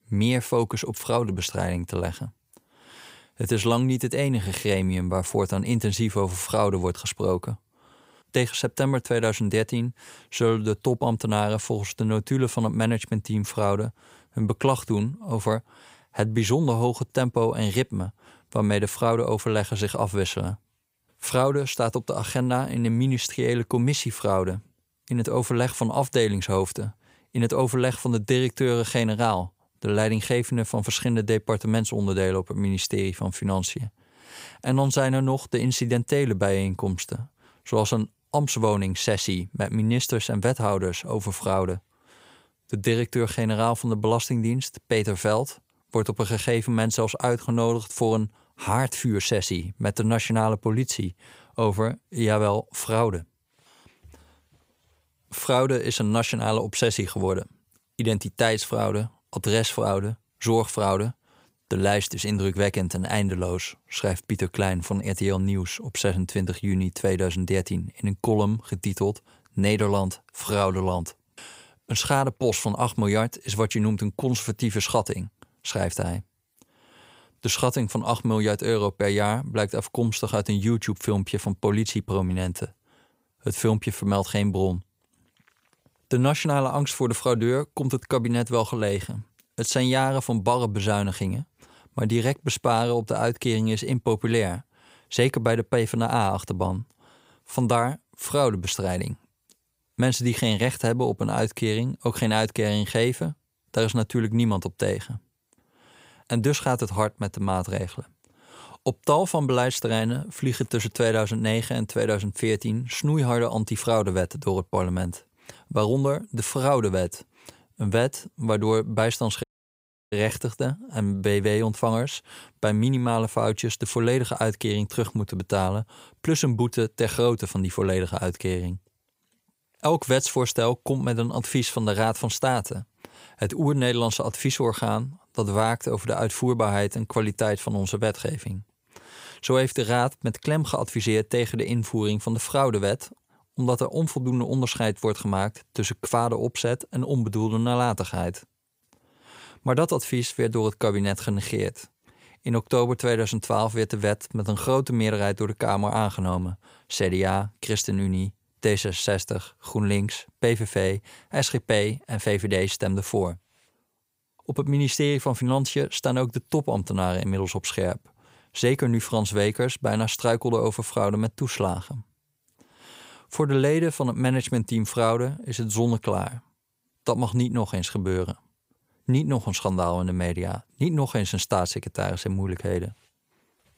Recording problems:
audio cutting out; at 1:59 for 0.5 s

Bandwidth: 15.5 kHz